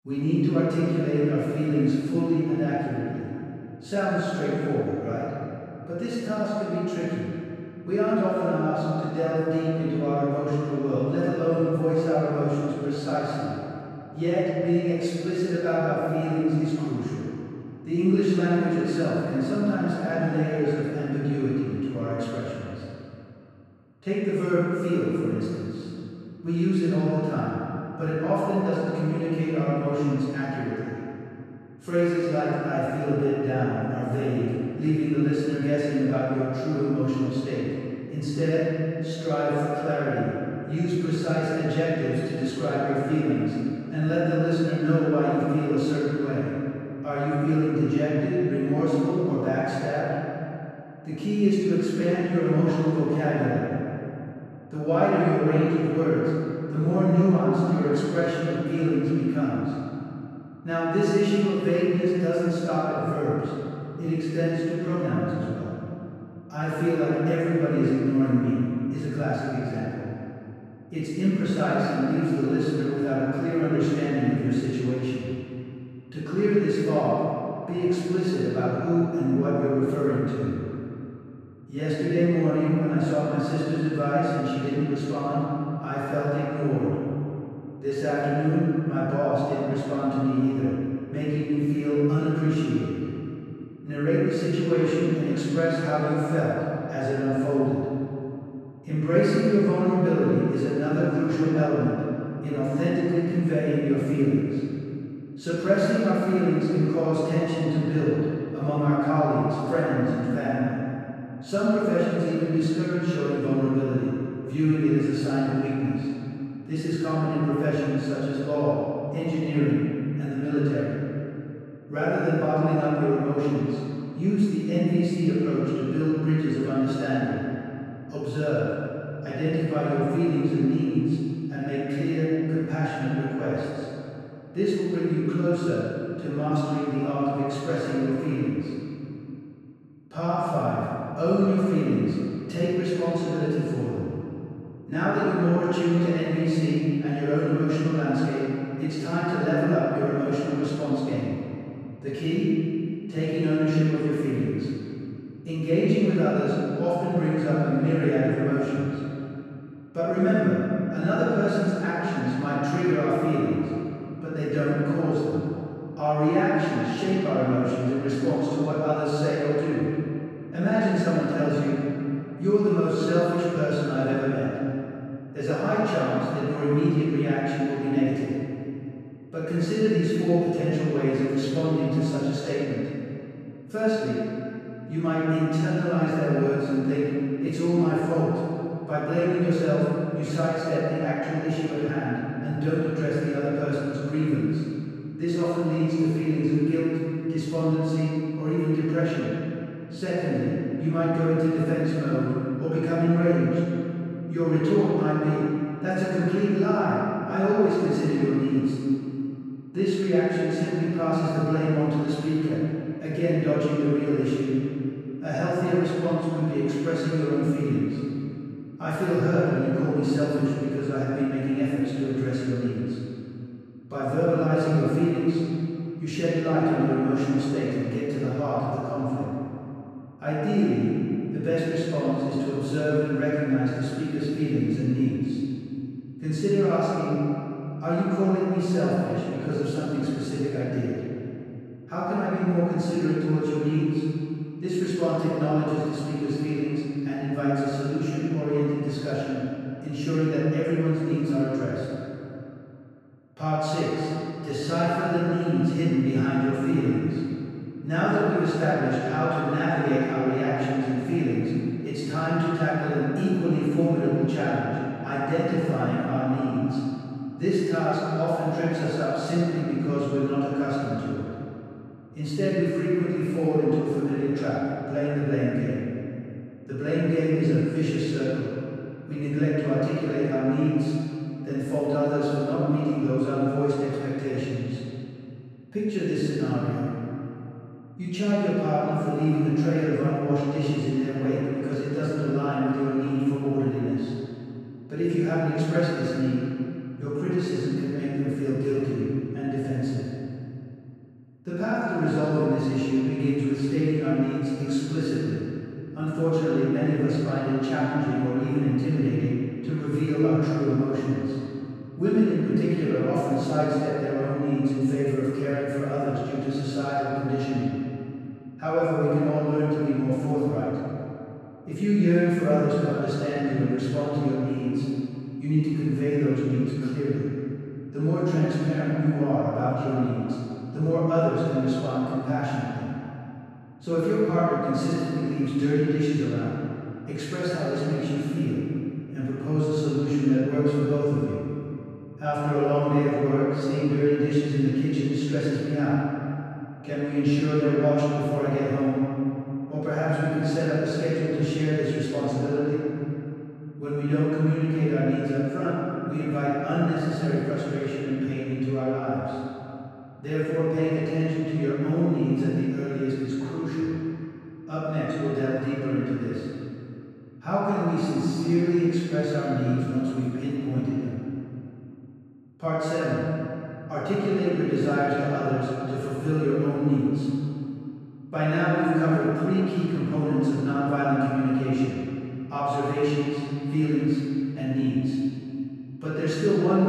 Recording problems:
room echo; strong; dies away in 2.6 s
off-mic speech; far
abrupt cut into speech; at the end

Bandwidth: 14.5 kHz